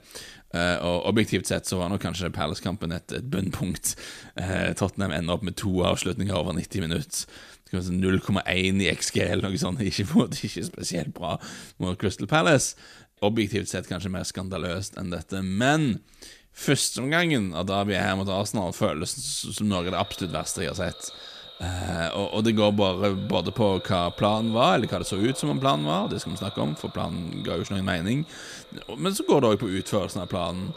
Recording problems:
echo of what is said; noticeable; from 20 s on; 550 ms later, 15 dB below the speech

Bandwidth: 14.5 kHz